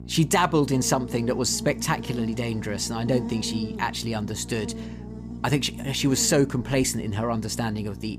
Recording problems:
electrical hum; noticeable; throughout; 60 Hz, 15 dB below the speech

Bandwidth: 15 kHz